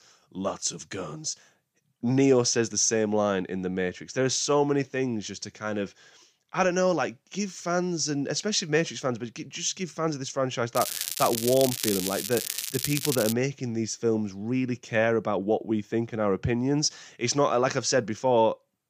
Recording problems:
crackling; loud; from 11 to 13 s; 3 dB below the speech

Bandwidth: 15 kHz